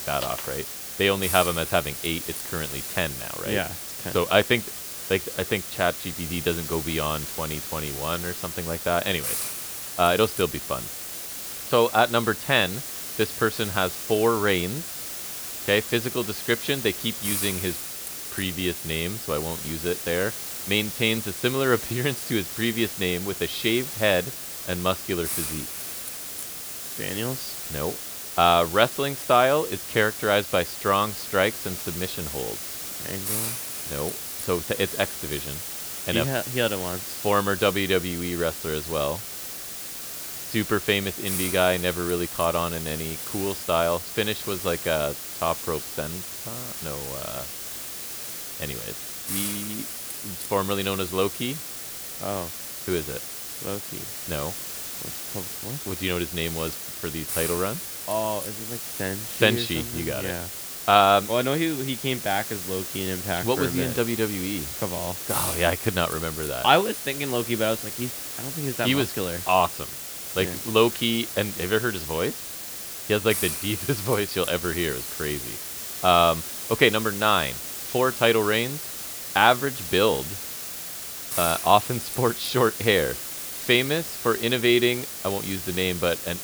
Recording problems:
hiss; loud; throughout; 6 dB below the speech

